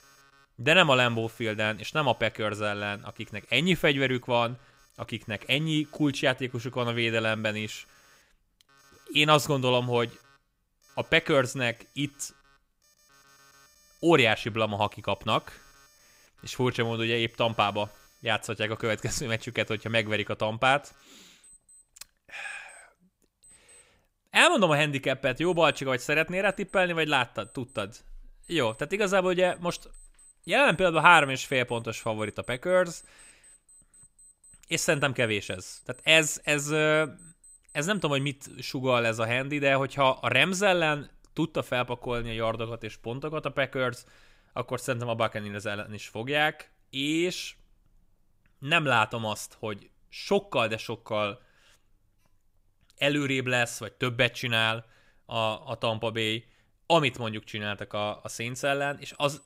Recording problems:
alarms or sirens; faint; throughout; 30 dB below the speech

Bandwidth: 15.5 kHz